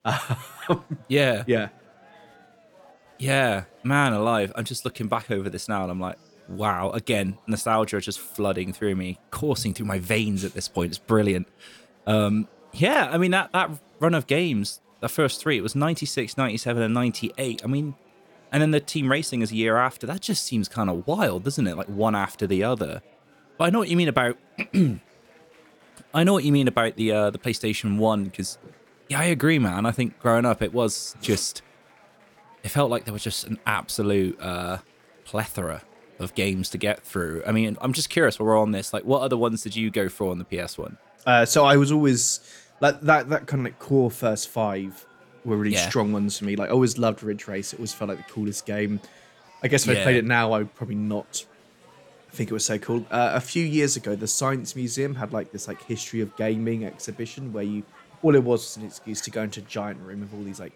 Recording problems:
chatter from many people; faint; throughout; 30 dB below the speech

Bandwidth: 17.5 kHz